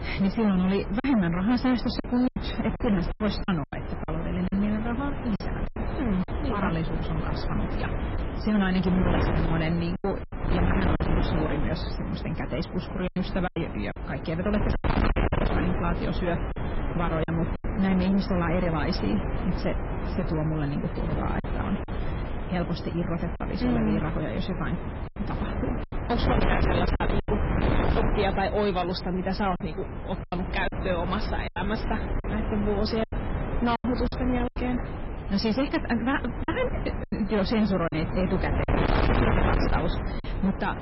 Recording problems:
distortion; heavy; 15% of the sound clipped
garbled, watery; badly; nothing above 5.5 kHz
wind noise on the microphone; heavy; 4 dB below the speech
choppy; very; 6% of the speech affected

